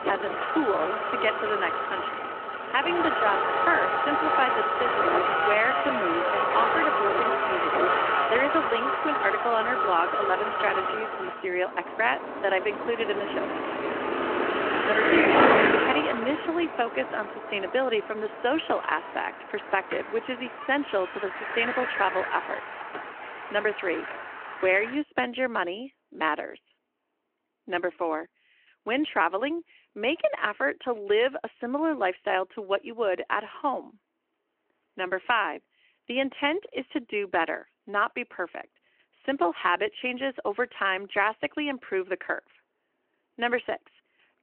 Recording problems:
phone-call audio
traffic noise; very loud; throughout; 2 dB above the speech

